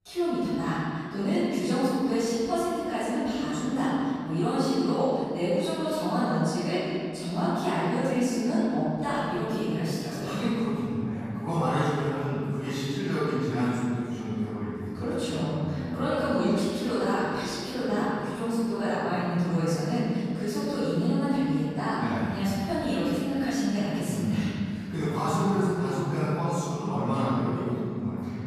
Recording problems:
room echo; strong; dies away in 2.5 s
off-mic speech; far

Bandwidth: 14.5 kHz